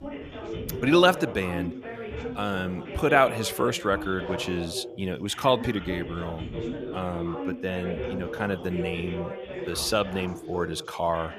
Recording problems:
background chatter; loud; throughout; 3 voices, 9 dB below the speech

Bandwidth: 14.5 kHz